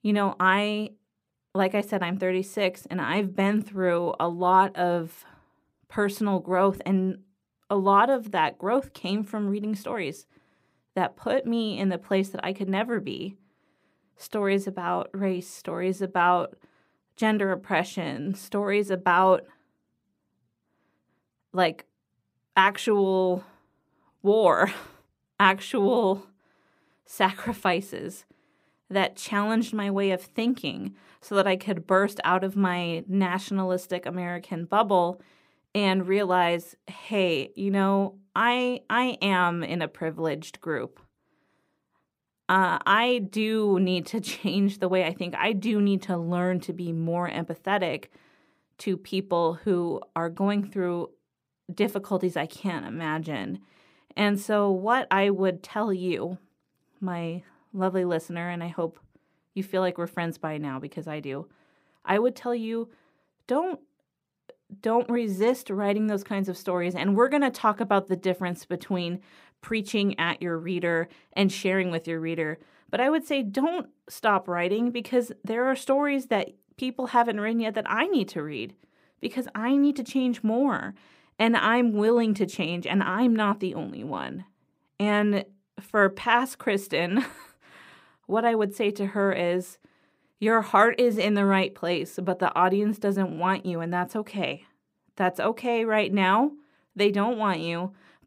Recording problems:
none

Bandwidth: 15.5 kHz